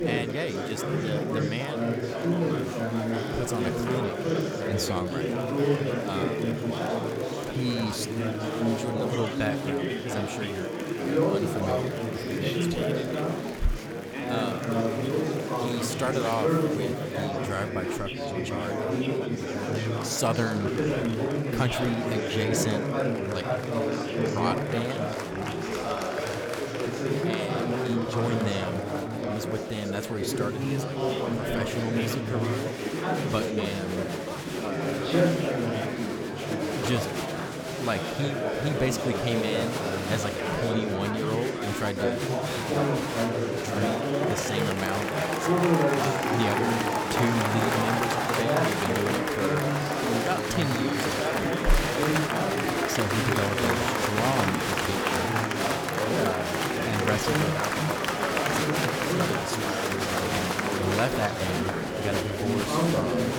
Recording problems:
murmuring crowd; very loud; throughout; 5 dB above the speech

